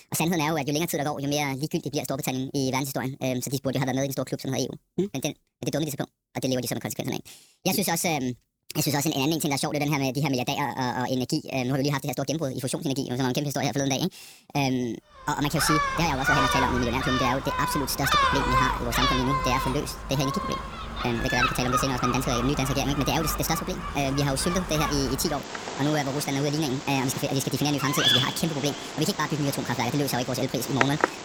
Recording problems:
wrong speed and pitch; too fast and too high; 1.5 times normal speed
animal sounds; loud; from 15 s on; 1 dB below the speech

